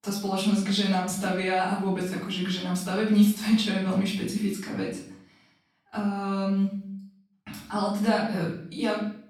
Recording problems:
off-mic speech; far
room echo; noticeable; dies away in 0.6 s

